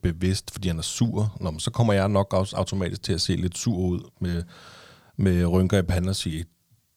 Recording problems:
none

